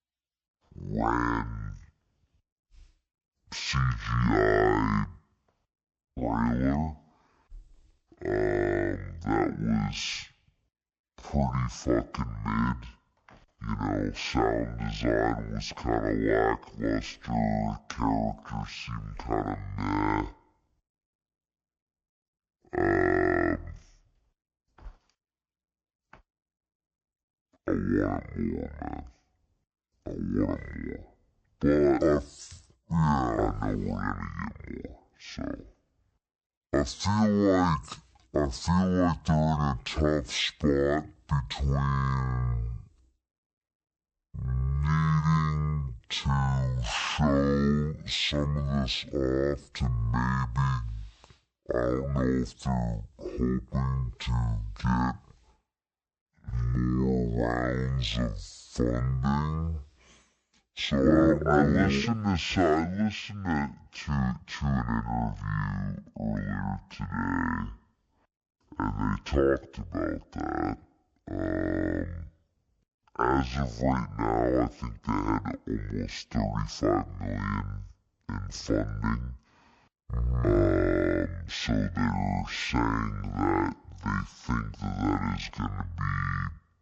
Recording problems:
wrong speed and pitch; too slow and too low; 0.5 times normal speed

